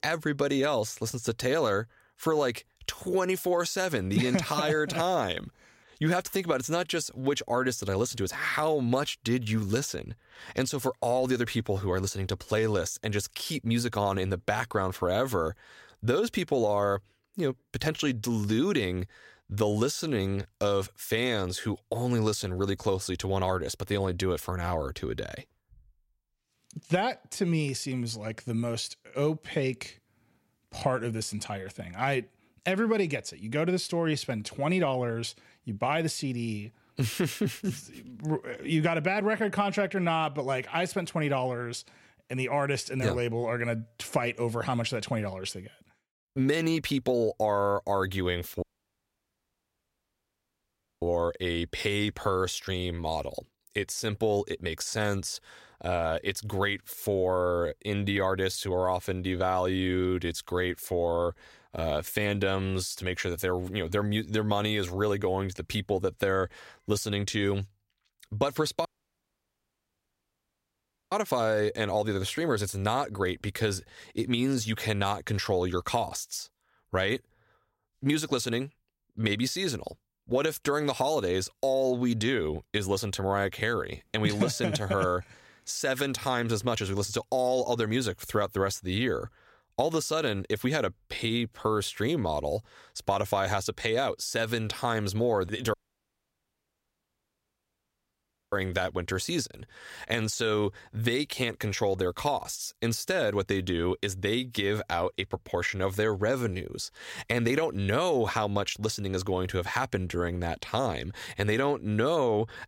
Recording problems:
audio cutting out; at 49 s for 2.5 s, at 1:09 for 2.5 s and at 1:36 for 3 s

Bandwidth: 16 kHz